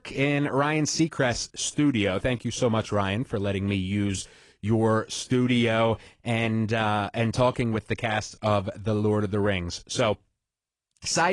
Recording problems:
garbled, watery; slightly
abrupt cut into speech; at the end

